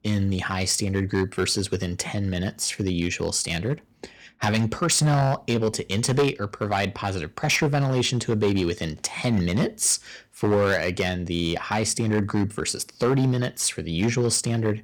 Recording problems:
distortion; slight; 5% of the sound clipped

